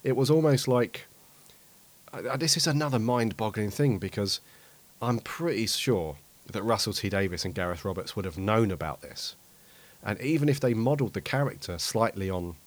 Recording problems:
hiss; faint; throughout; 25 dB below the speech

